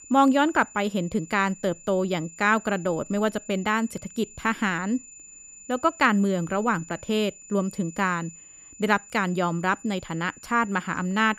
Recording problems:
high-pitched whine; noticeable; throughout; 7 kHz, 20 dB below the speech

